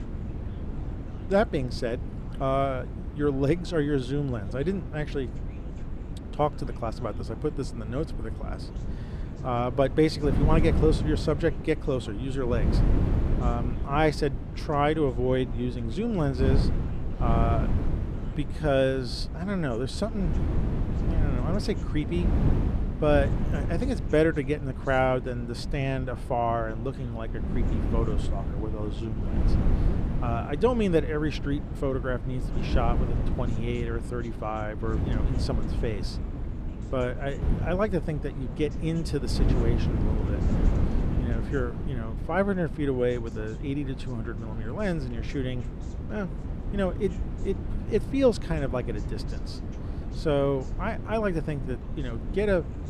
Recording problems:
wind noise on the microphone; occasional gusts; 10 dB below the speech
background chatter; faint; throughout; 2 voices, 25 dB below the speech

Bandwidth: 15 kHz